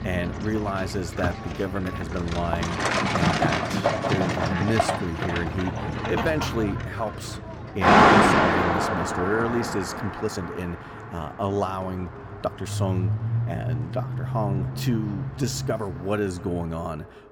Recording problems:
echo of what is said; faint; throughout; 270 ms later, 20 dB below the speech
traffic noise; very loud; throughout; 5 dB above the speech
uneven, jittery; strongly; from 1.5 to 16 s

